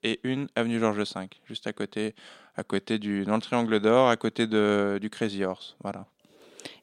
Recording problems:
none

